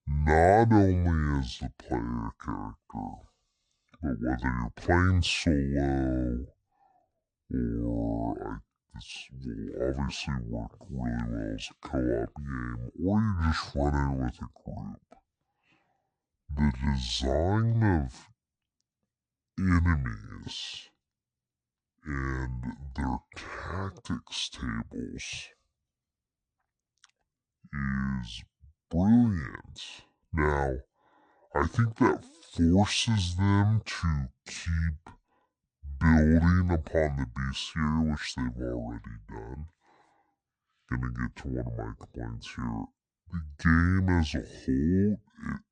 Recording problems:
wrong speed and pitch; too slow and too low; 0.6 times normal speed

